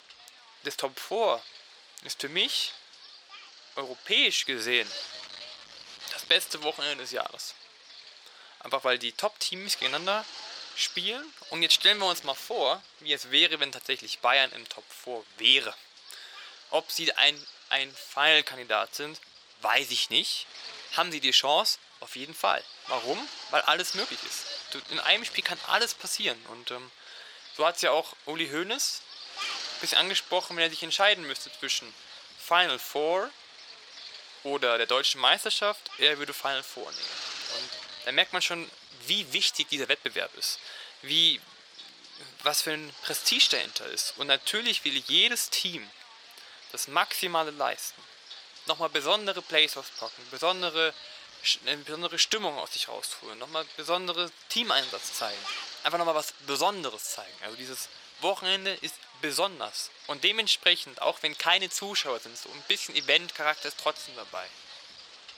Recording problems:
thin; very; fading below 650 Hz
wind noise on the microphone; occasional gusts; 15 dB below the speech

